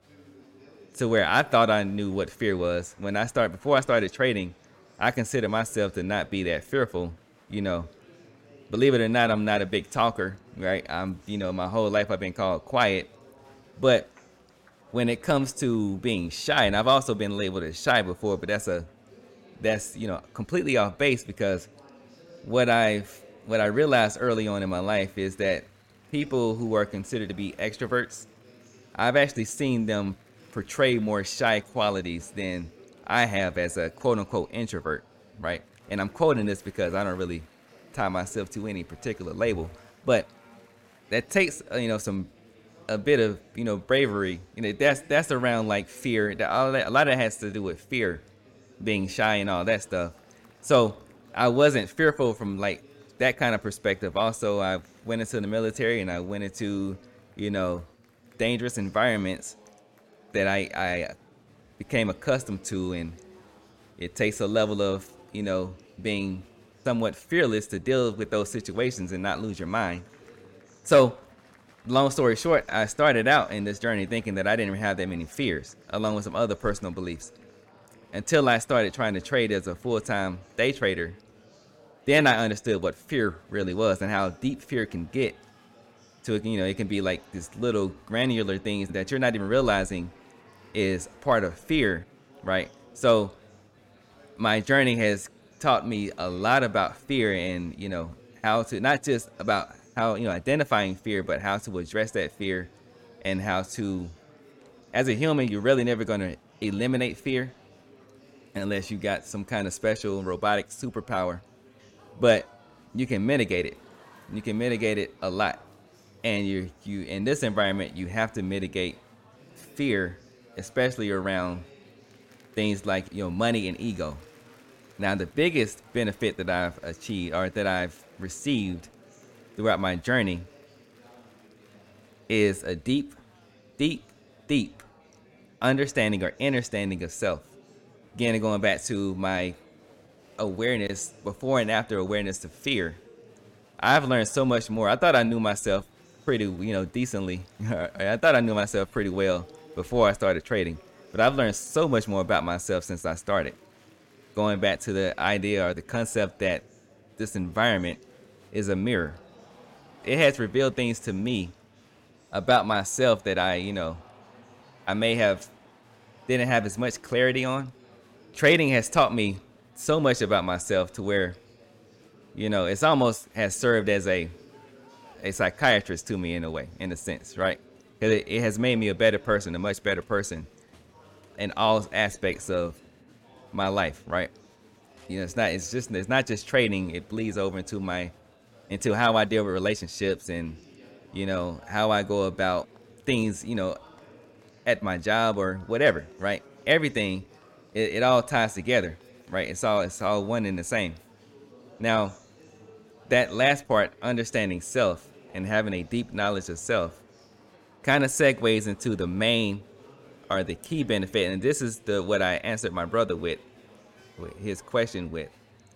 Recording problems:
murmuring crowd; faint; throughout; 25 dB below the speech

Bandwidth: 16.5 kHz